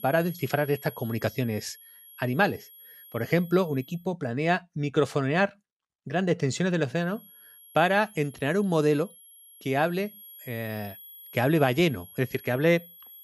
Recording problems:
high-pitched whine; noticeable; until 4 s and from 7 s on; 11.5 kHz, 20 dB below the speech

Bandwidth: 14.5 kHz